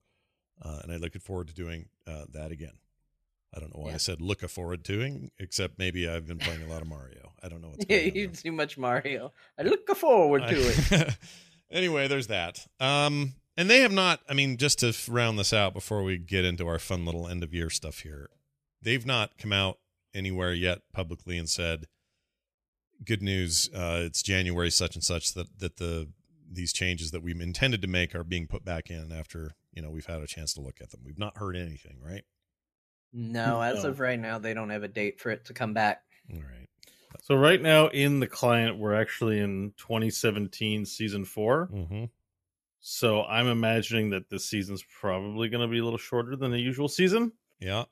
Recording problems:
none

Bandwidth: 14.5 kHz